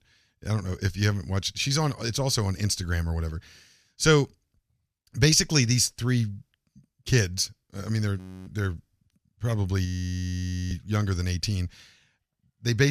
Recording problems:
audio freezing; at 8 s and at 10 s for 1 s
abrupt cut into speech; at the end

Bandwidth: 14.5 kHz